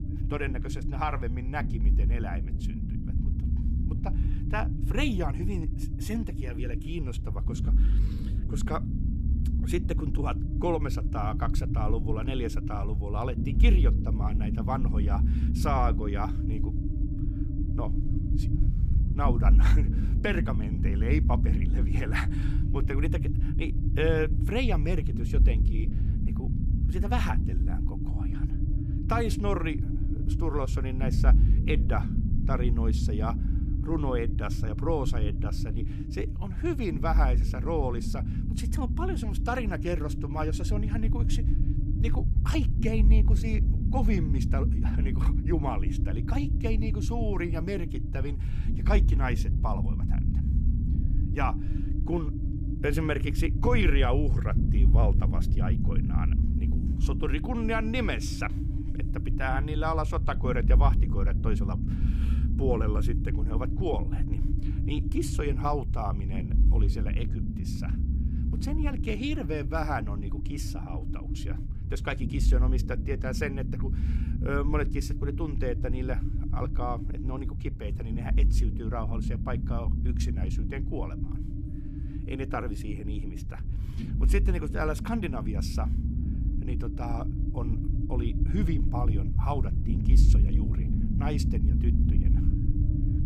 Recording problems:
low rumble; loud; throughout; 7 dB below the speech

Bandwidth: 14 kHz